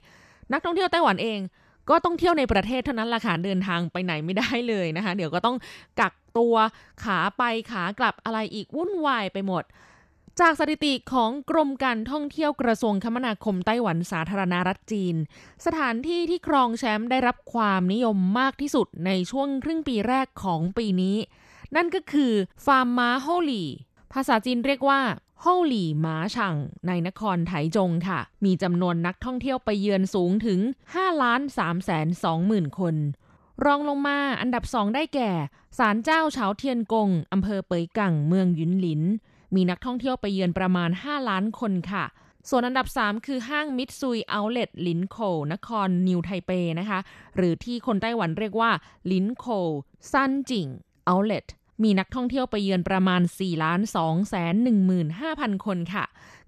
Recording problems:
none

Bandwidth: 13.5 kHz